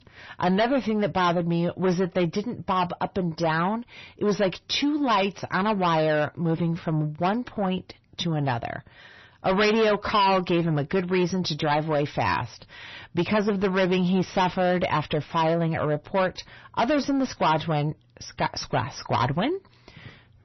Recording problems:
distortion; heavy; 6 dB below the speech
garbled, watery; slightly; nothing above 6 kHz

